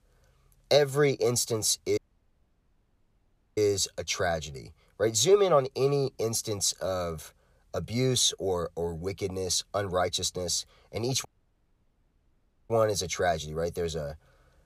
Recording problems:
audio cutting out; at 2 s for 1.5 s and at 11 s for 1.5 s

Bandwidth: 14.5 kHz